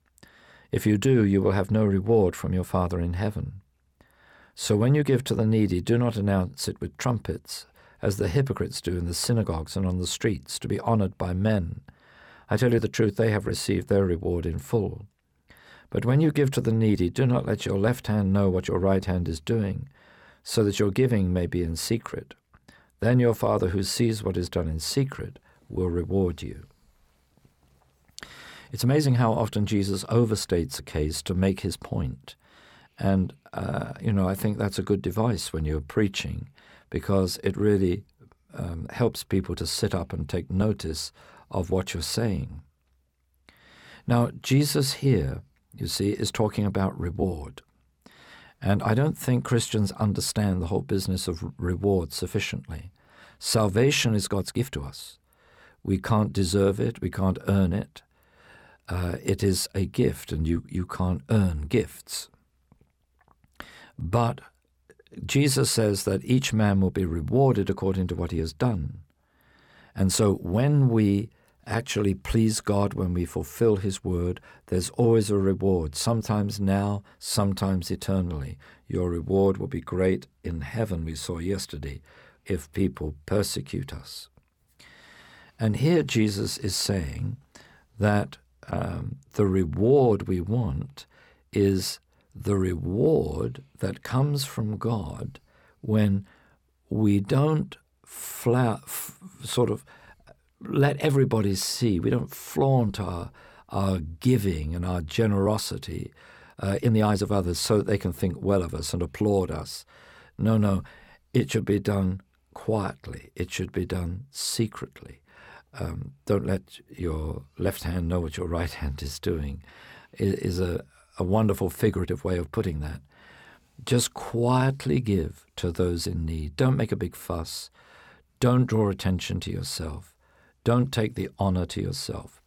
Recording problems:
uneven, jittery; strongly; from 12 s to 2:05

